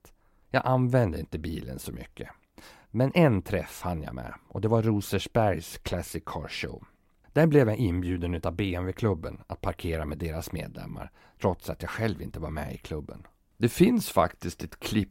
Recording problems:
none

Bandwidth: 16 kHz